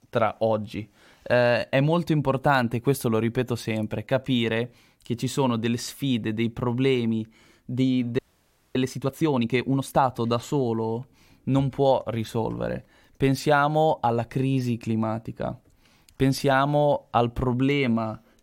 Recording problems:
audio freezing; at 8 s for 0.5 s

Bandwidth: 16 kHz